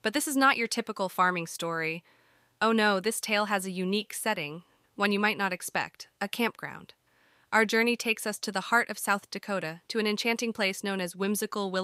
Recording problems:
abrupt cut into speech; at the end

